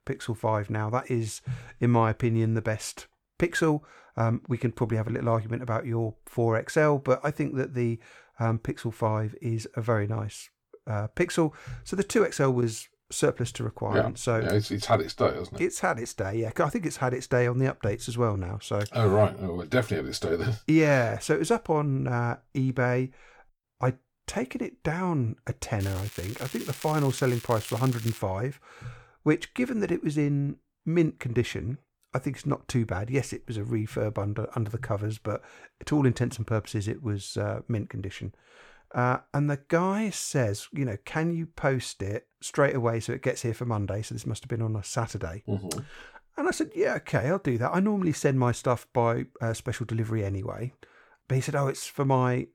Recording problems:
crackling; noticeable; from 26 to 28 s; 15 dB below the speech

